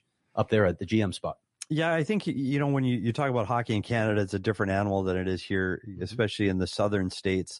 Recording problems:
garbled, watery; slightly; nothing above 11 kHz

